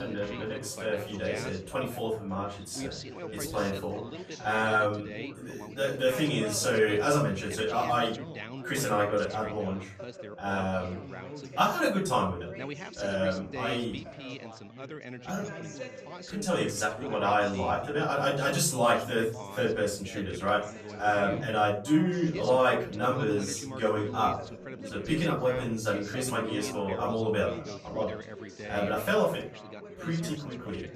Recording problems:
off-mic speech; far
room echo; slight; dies away in 0.4 s
background chatter; noticeable; throughout; 3 voices, 10 dB below the speech
abrupt cut into speech; at the start

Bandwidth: 14.5 kHz